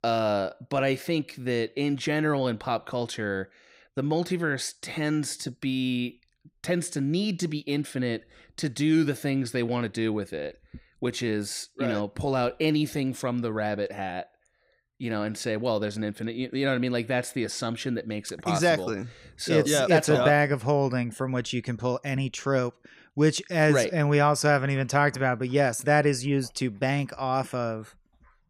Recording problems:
none

